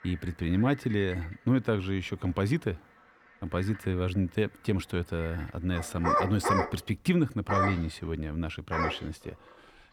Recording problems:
animal sounds; loud; throughout; 1 dB below the speech

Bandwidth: 18.5 kHz